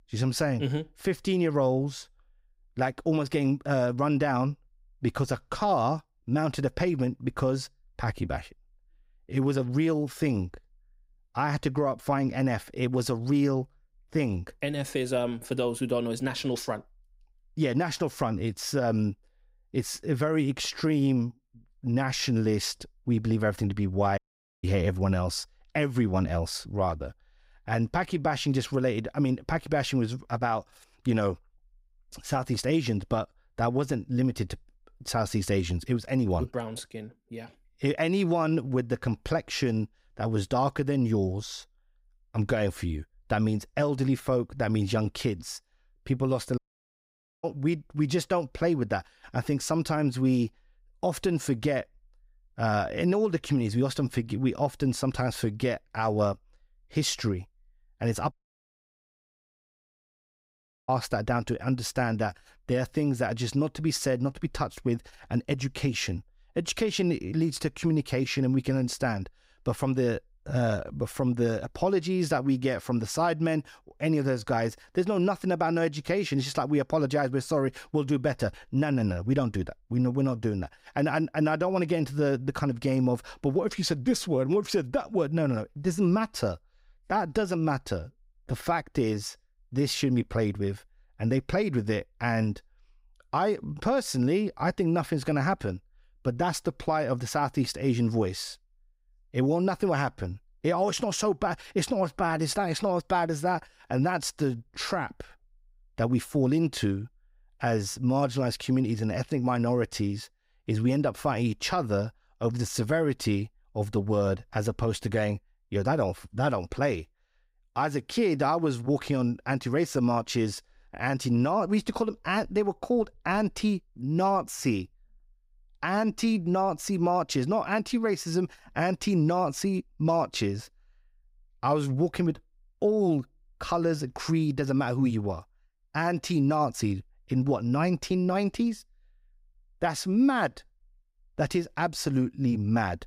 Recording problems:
audio cutting out; at 24 s, at 47 s for 1 s and at 58 s for 2.5 s

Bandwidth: 15.5 kHz